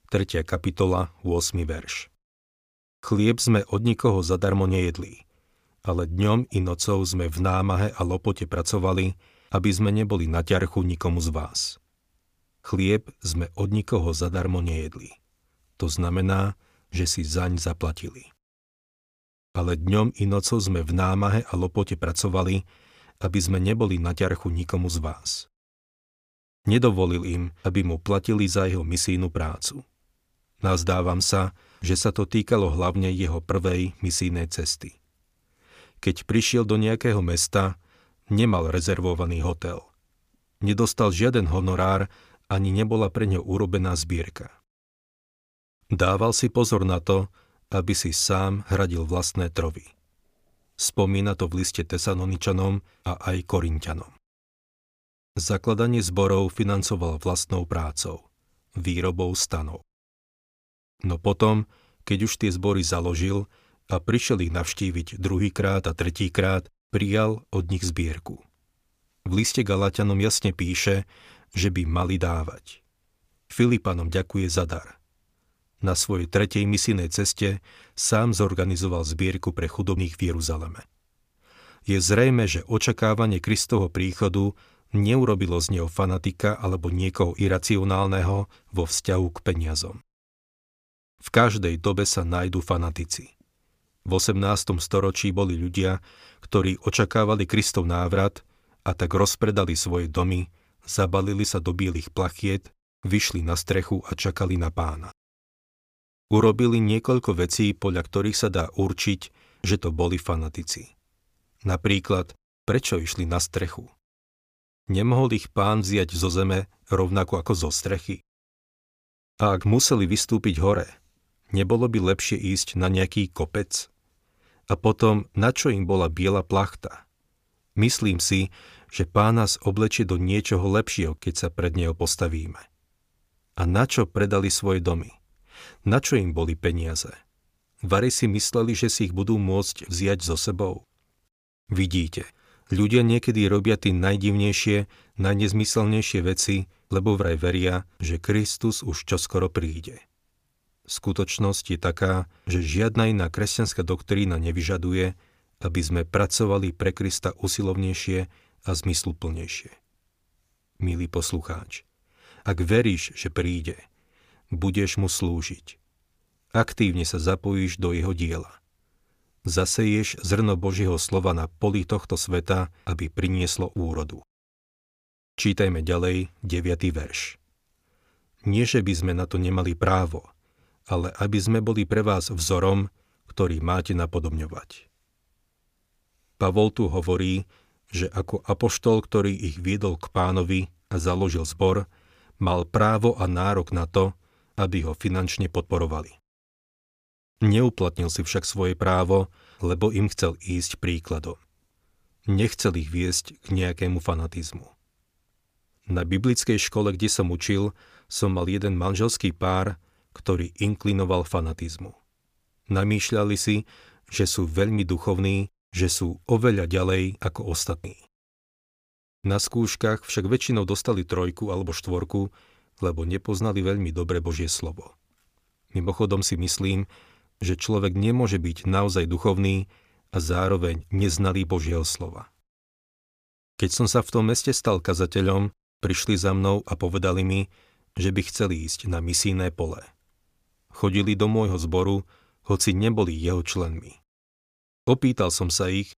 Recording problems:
none

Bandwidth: 15 kHz